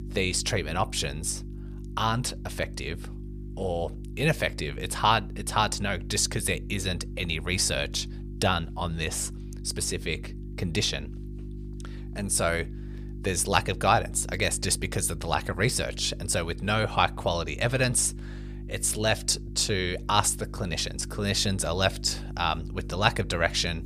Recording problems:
electrical hum; faint; throughout; 50 Hz, 20 dB below the speech

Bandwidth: 15 kHz